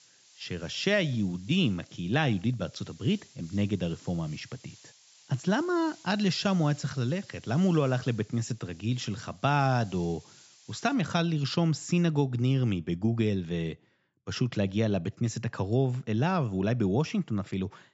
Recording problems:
high frequencies cut off; noticeable; nothing above 8 kHz
hiss; faint; until 11 s; 25 dB below the speech

